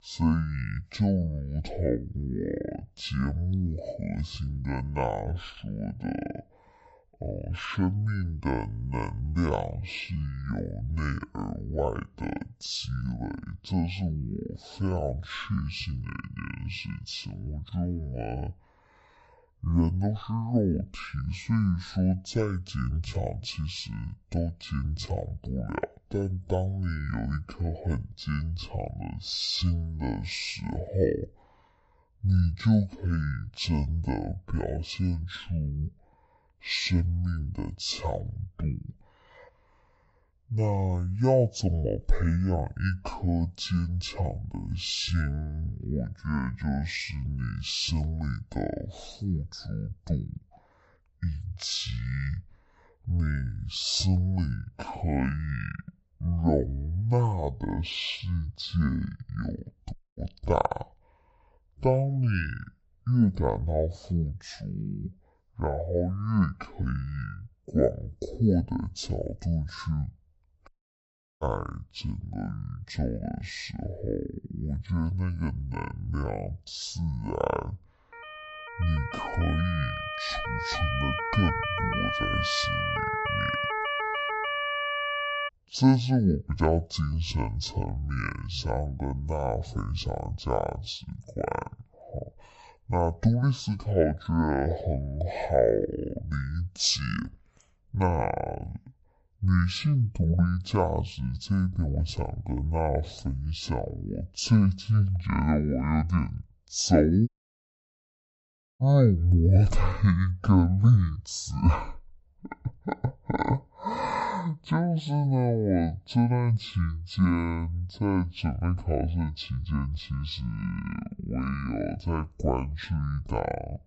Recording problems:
wrong speed and pitch; too slow and too low; 0.5 times normal speed
audio cutting out; at 1:00, at 1:11 for 0.5 s and at 1:47 for 1.5 s
siren; loud; from 1:18 to 1:25; peak 1 dB above the speech

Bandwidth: 8 kHz